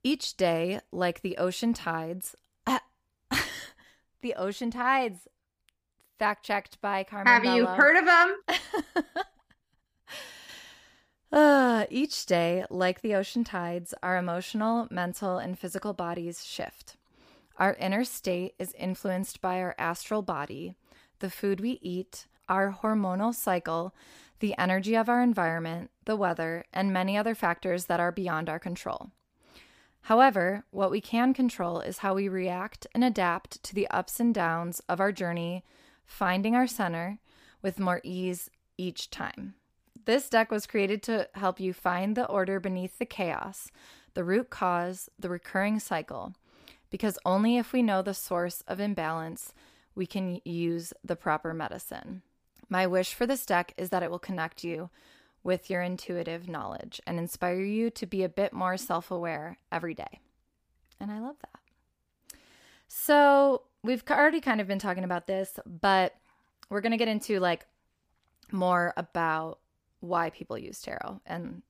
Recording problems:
none

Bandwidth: 15 kHz